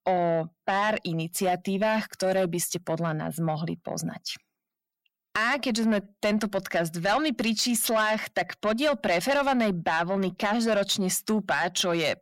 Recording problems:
distortion; slight; 10 dB below the speech

